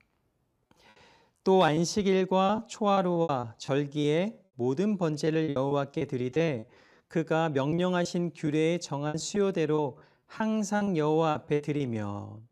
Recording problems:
choppy; very; 11% of the speech affected

